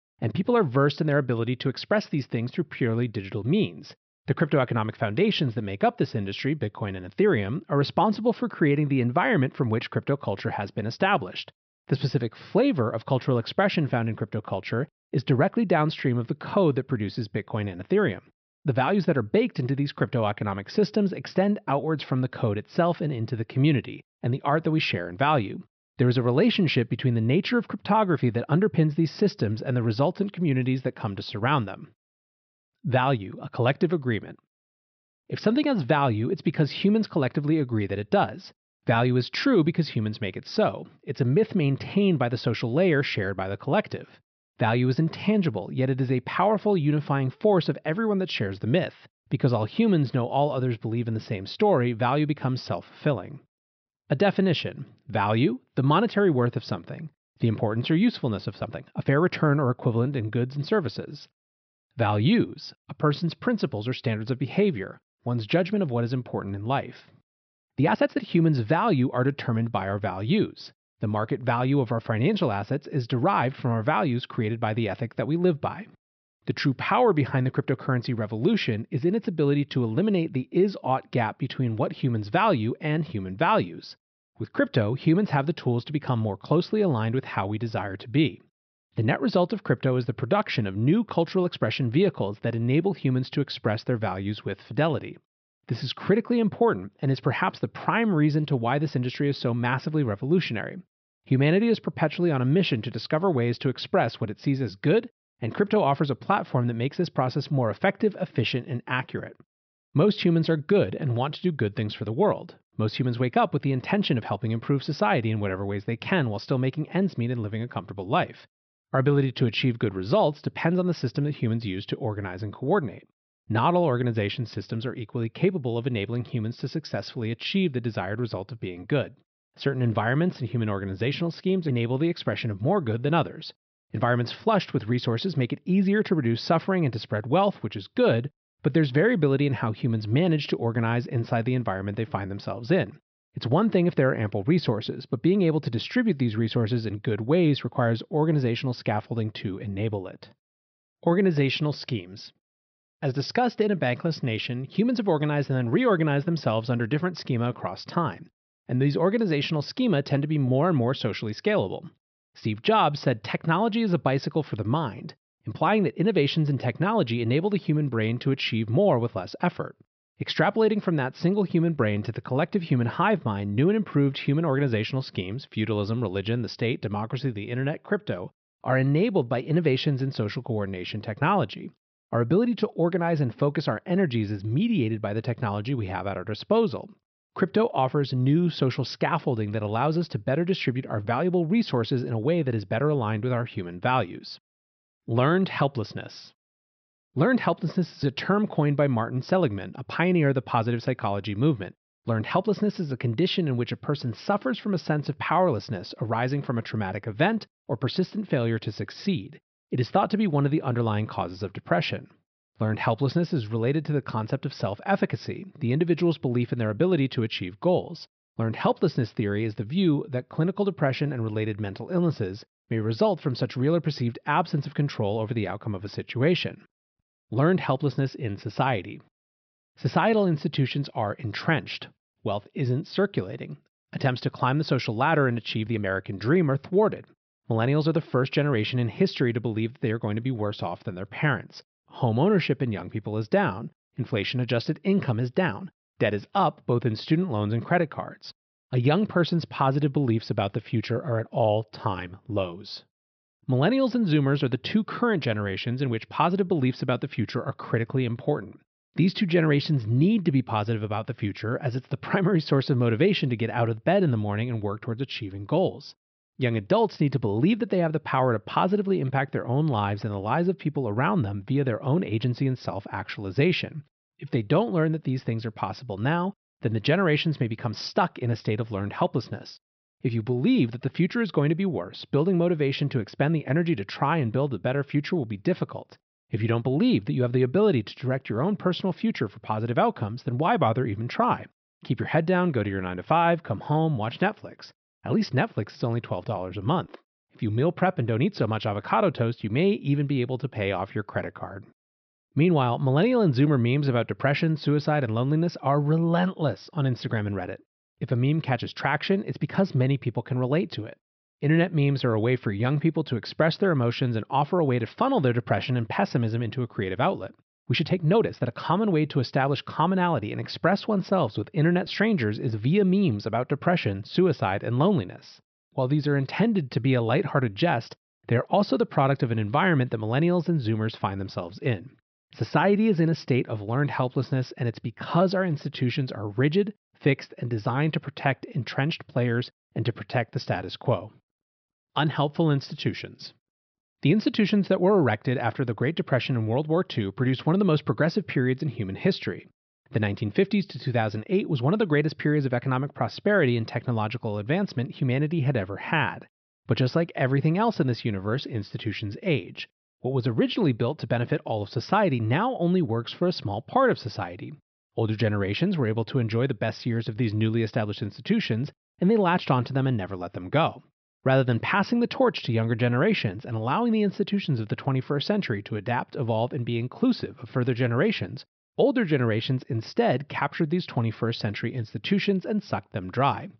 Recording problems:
high frequencies cut off; noticeable; nothing above 5.5 kHz
uneven, jittery; strongly; from 59 s to 5:19

